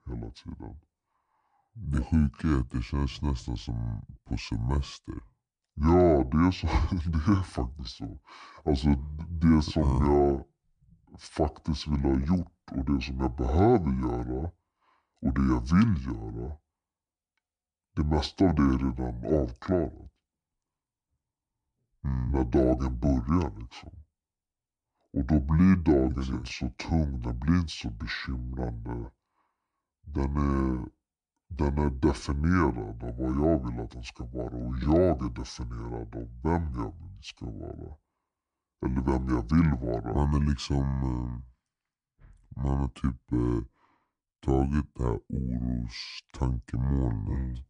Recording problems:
wrong speed and pitch; too slow and too low; 0.7 times normal speed

